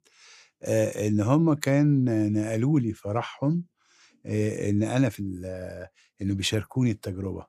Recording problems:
none

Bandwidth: 14.5 kHz